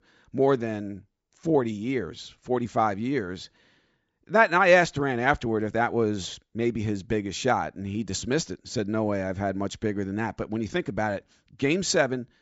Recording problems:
high frequencies cut off; noticeable; nothing above 8 kHz

